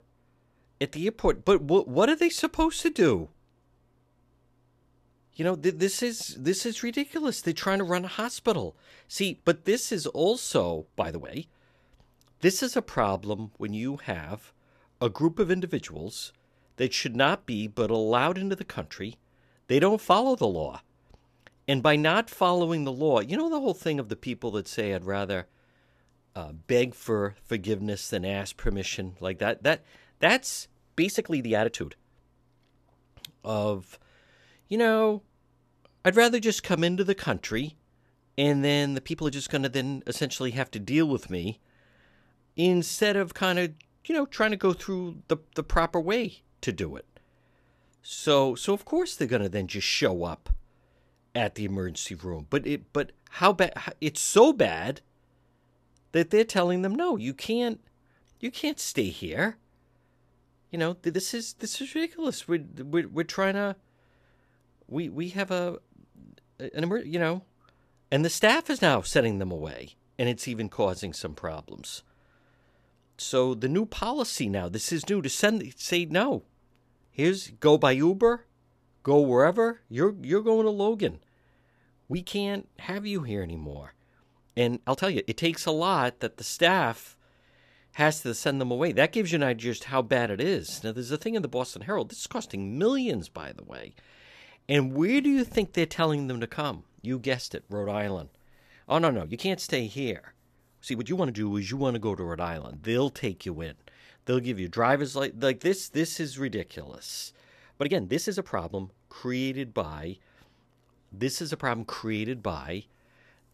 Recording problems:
uneven, jittery; strongly; from 11 s to 1:49

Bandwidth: 14 kHz